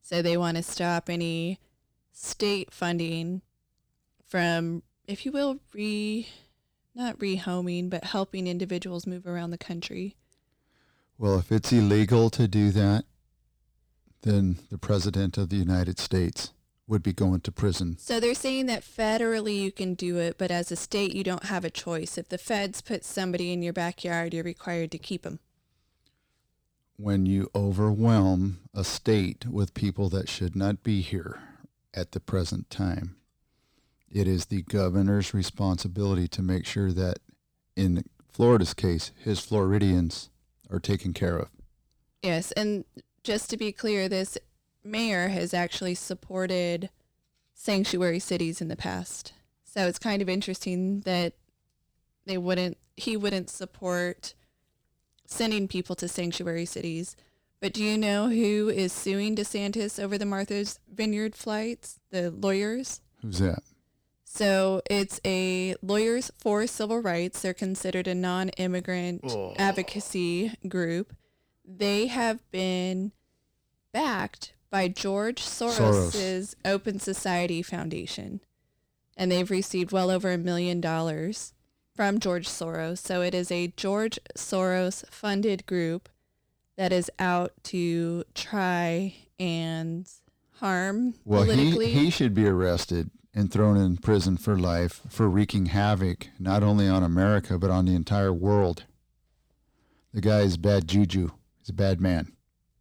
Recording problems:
distortion; slight; 10 dB below the speech

